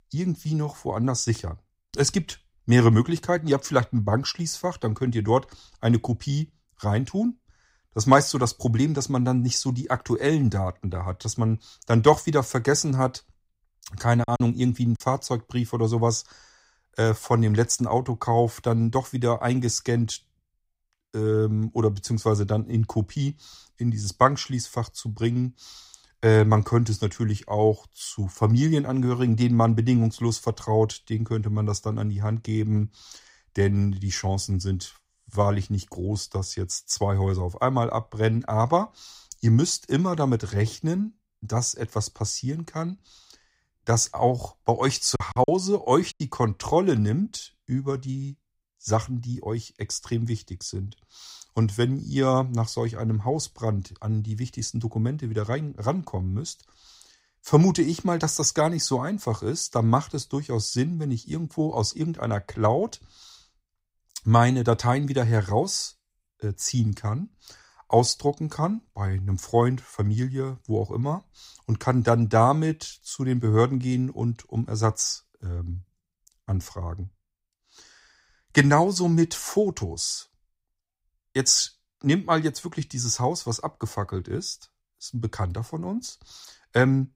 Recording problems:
choppy; very; at 14 s and from 45 to 46 s; 11% of the speech affected

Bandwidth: 15.5 kHz